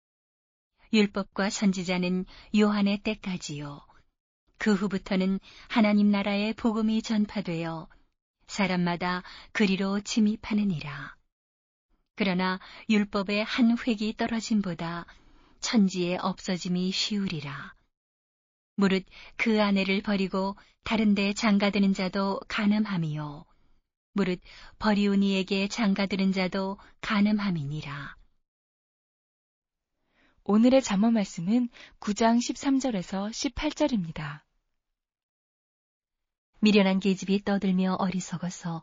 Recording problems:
garbled, watery; slightly

